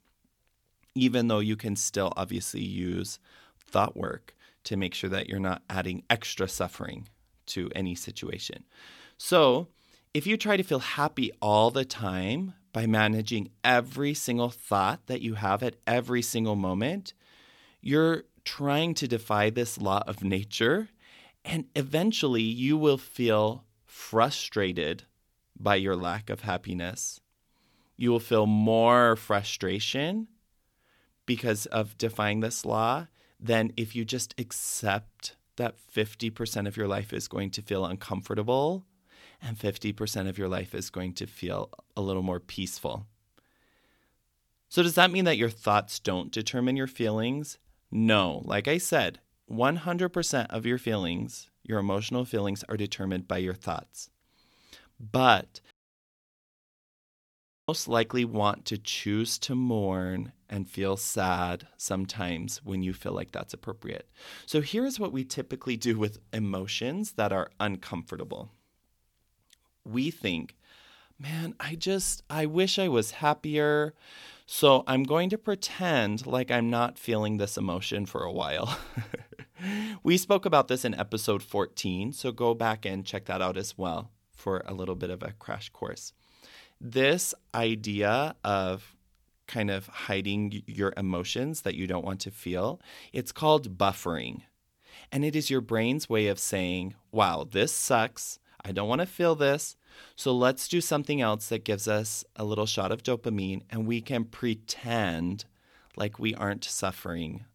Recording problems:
audio cutting out; at 56 s for 2 s

